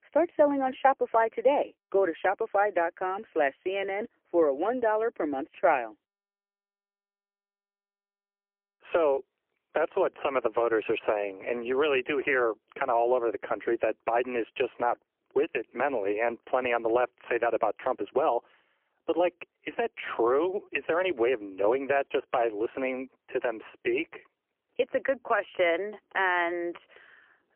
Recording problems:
phone-call audio; poor line; nothing above 3 kHz

